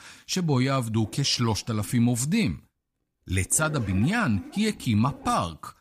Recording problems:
household noises; noticeable; throughout; 20 dB below the speech

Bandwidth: 15 kHz